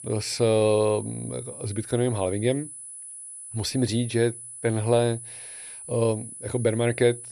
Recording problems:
high-pitched whine; noticeable; throughout; 10 kHz, 10 dB below the speech

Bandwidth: 14.5 kHz